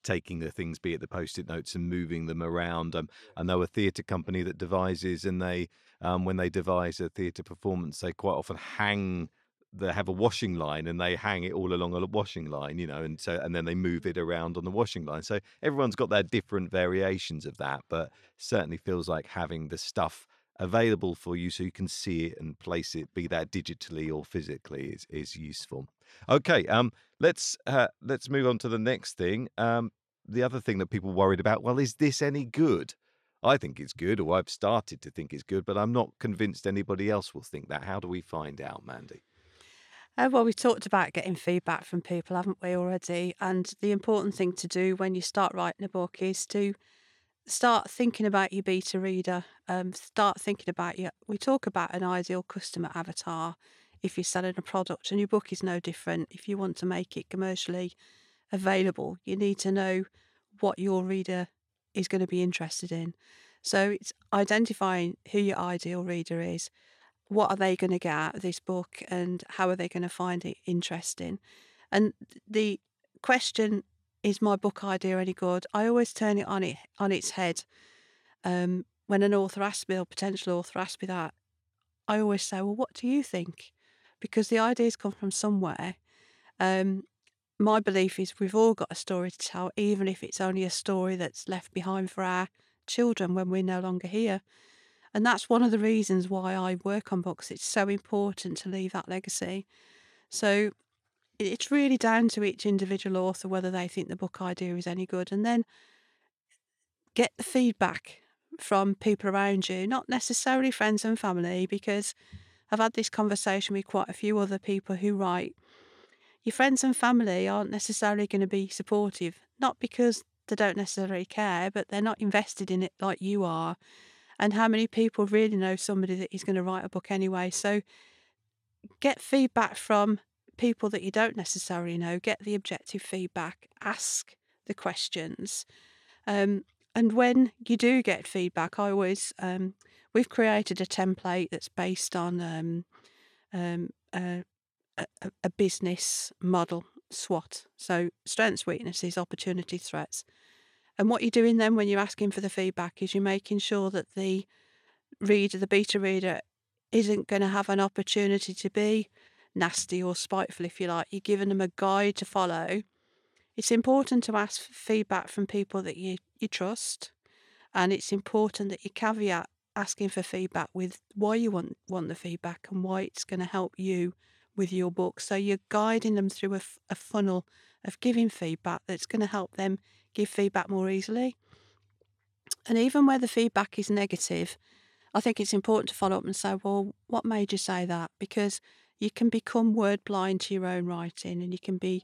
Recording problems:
none

